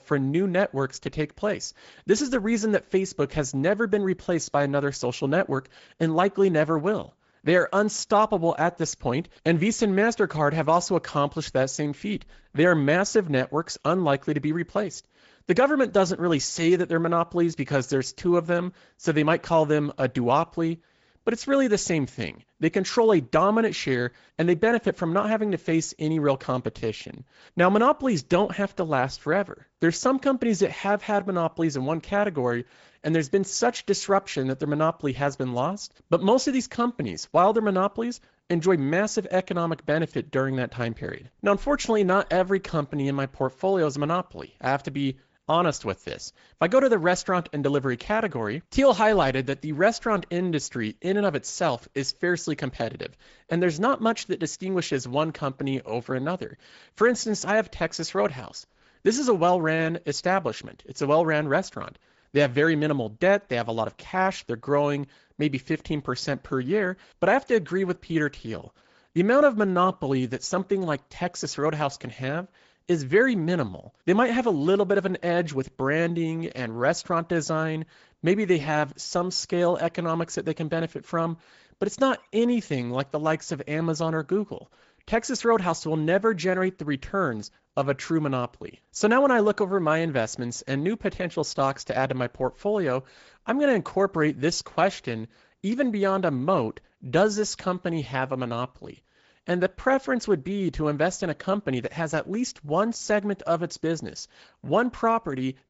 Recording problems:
high frequencies cut off; noticeable; nothing above 7.5 kHz
garbled, watery; slightly

